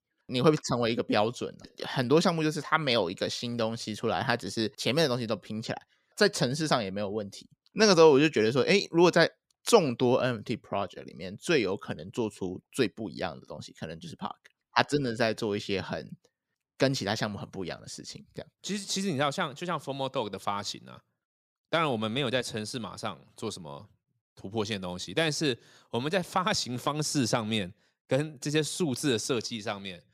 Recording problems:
none

